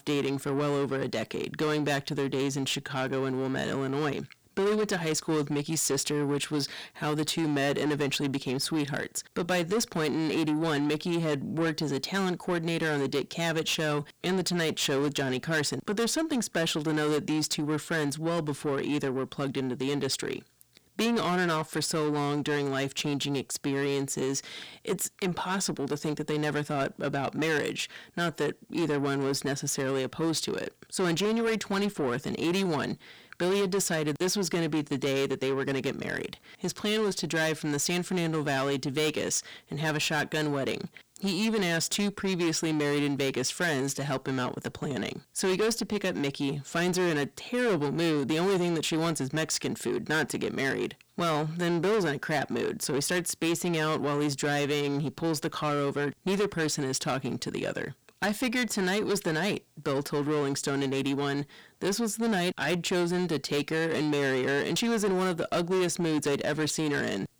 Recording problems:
distortion; heavy; 8 dB below the speech

